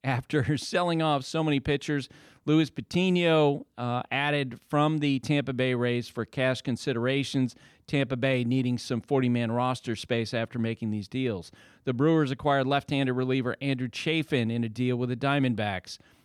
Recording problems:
none

